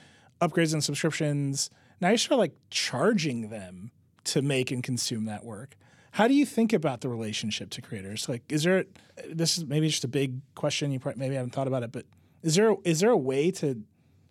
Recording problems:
none

